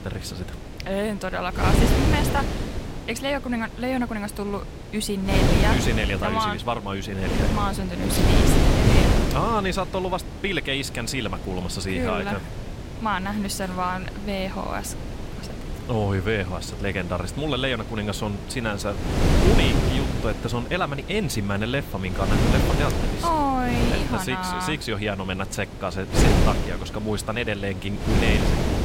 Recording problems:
wind noise on the microphone; heavy; 3 dB below the speech

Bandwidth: 16 kHz